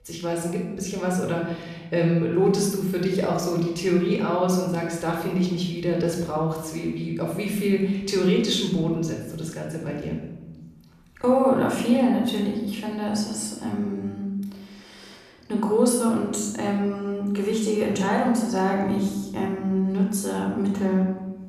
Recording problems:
room echo; noticeable; dies away in 0.9 s
off-mic speech; somewhat distant

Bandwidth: 14.5 kHz